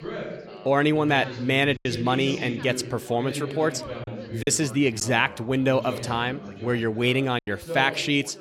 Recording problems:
background chatter; noticeable; throughout; 3 voices, 10 dB below the speech
choppy; occasionally; at 2 s, at 4.5 s and at 7.5 s; 4% of the speech affected

